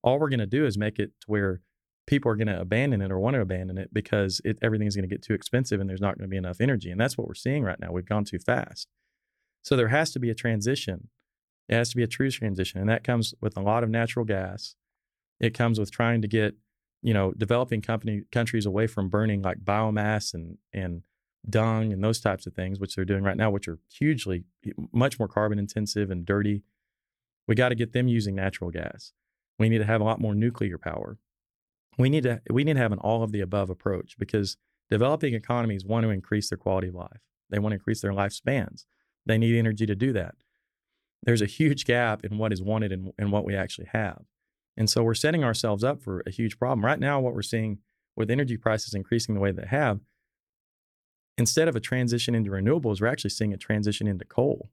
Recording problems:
none

